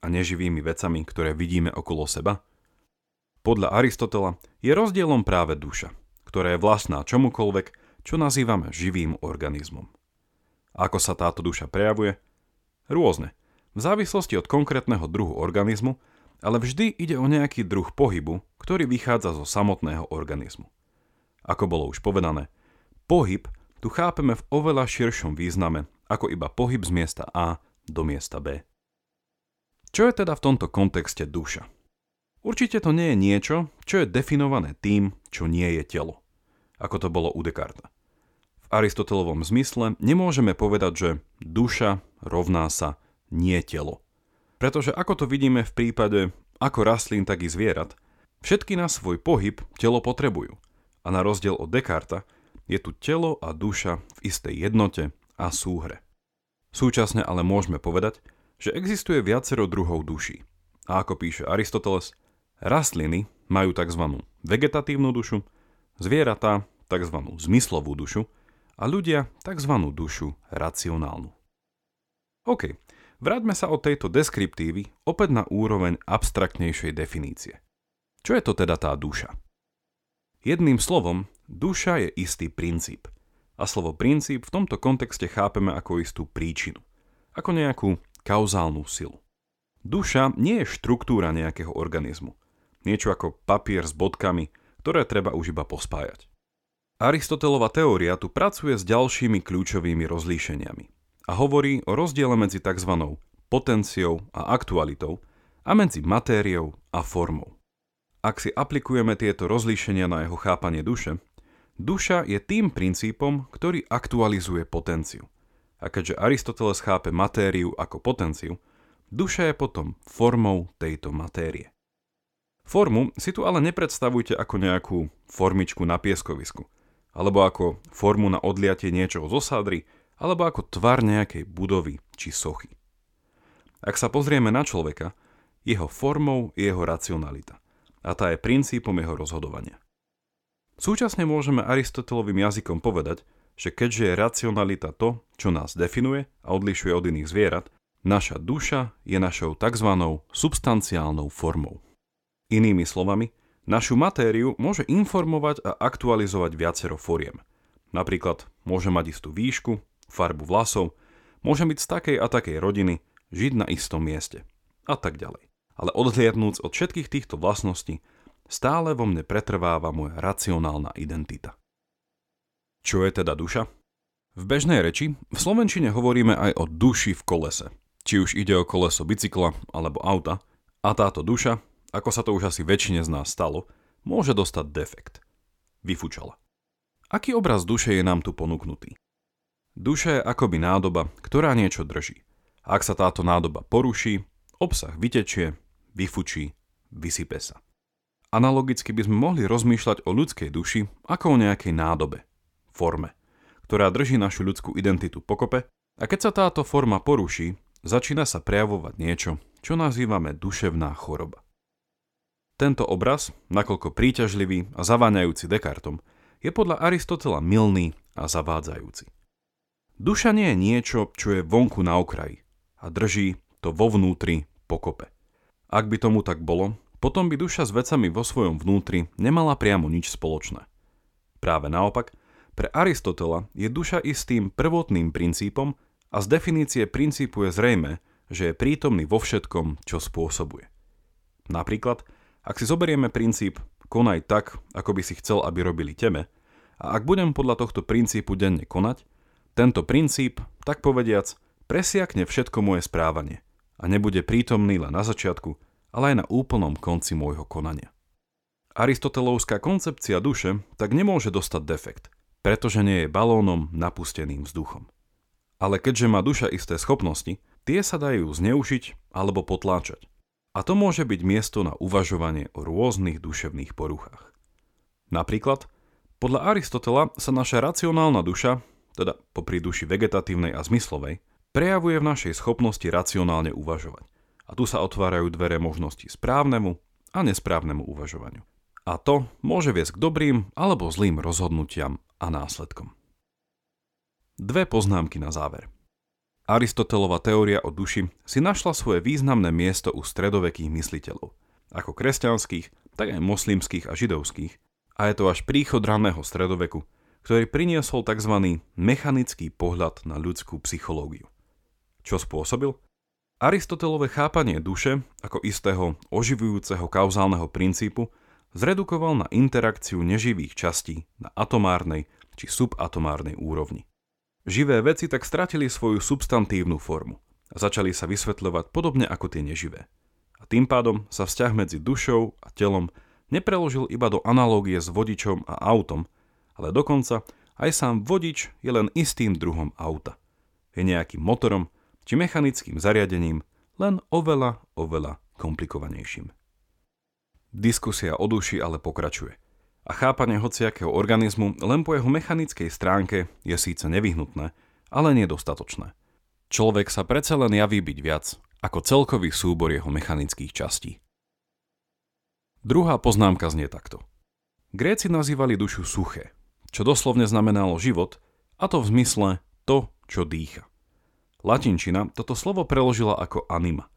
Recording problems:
none

